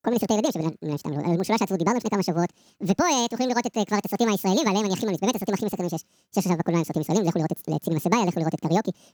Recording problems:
wrong speed and pitch; too fast and too high; 1.7 times normal speed

